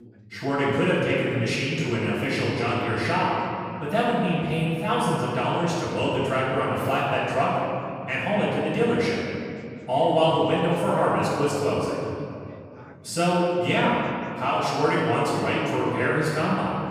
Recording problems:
room echo; strong; dies away in 2.3 s
off-mic speech; far
voice in the background; faint; throughout; 25 dB below the speech

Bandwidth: 15 kHz